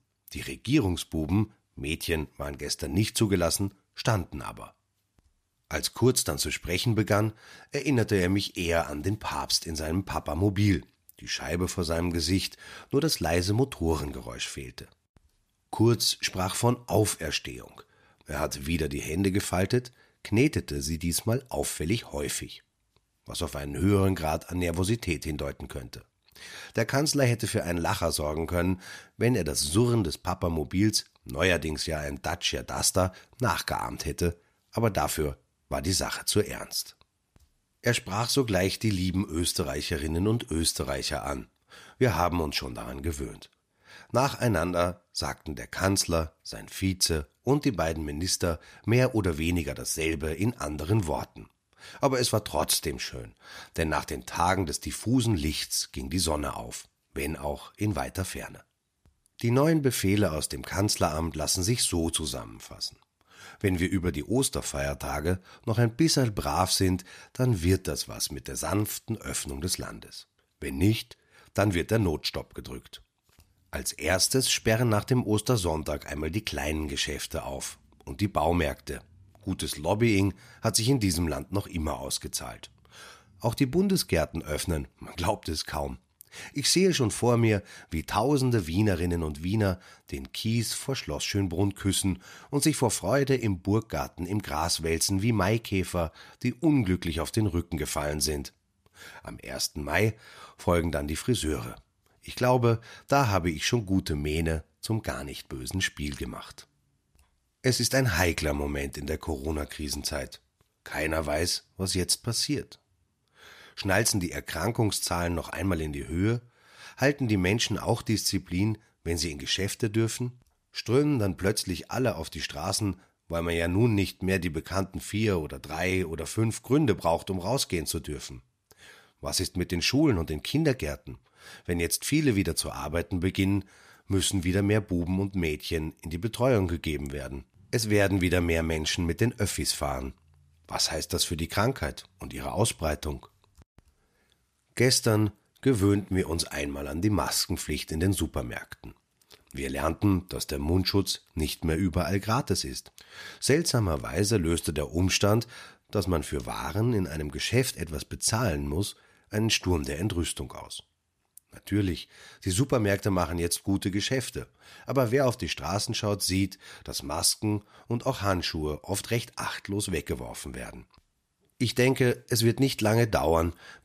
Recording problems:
none

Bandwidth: 14.5 kHz